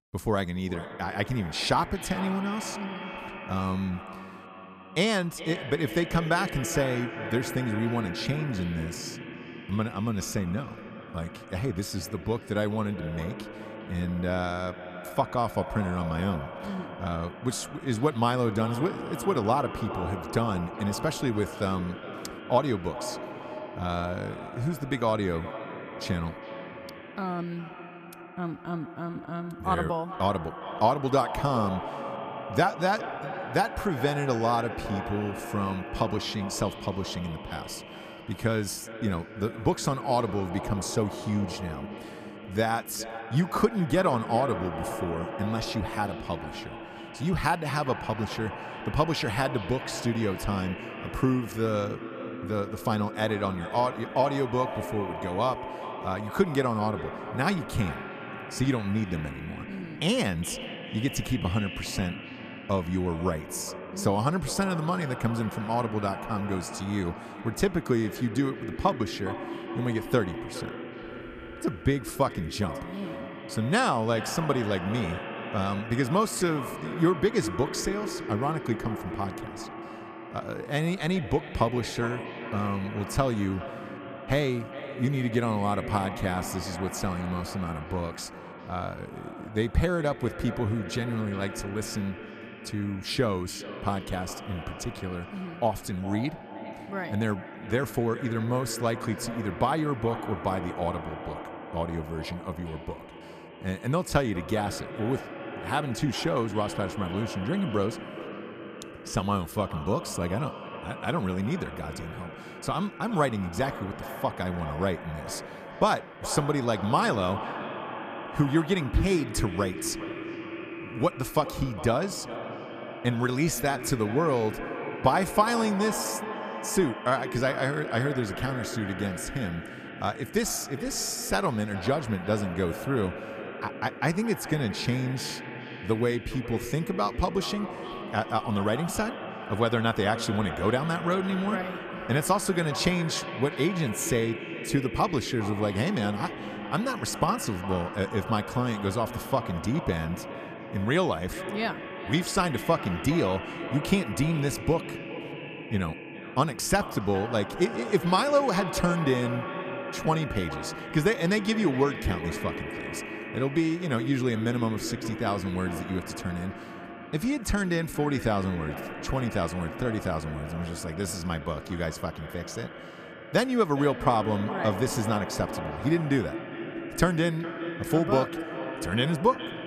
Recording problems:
echo of what is said; strong; throughout; 410 ms later, 9 dB below the speech

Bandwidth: 14.5 kHz